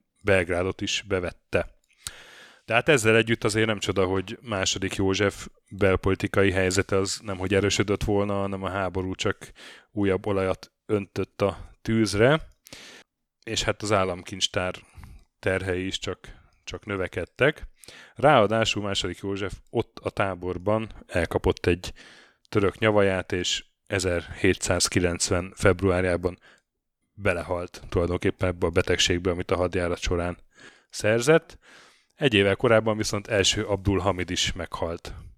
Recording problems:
none

